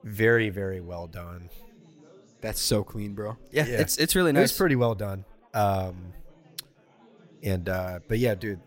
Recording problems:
chatter from many people; faint; throughout; 30 dB below the speech

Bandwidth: 16 kHz